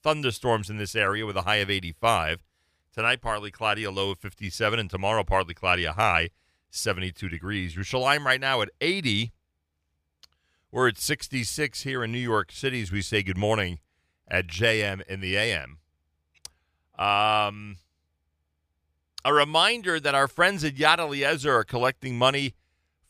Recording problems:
none

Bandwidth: 15 kHz